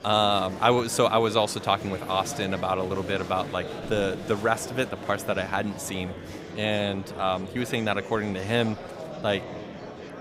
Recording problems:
murmuring crowd; noticeable; throughout; 10 dB below the speech

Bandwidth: 15.5 kHz